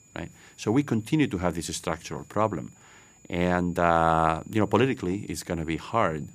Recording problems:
high-pitched whine; faint; throughout; 7 kHz, 30 dB below the speech

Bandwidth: 15 kHz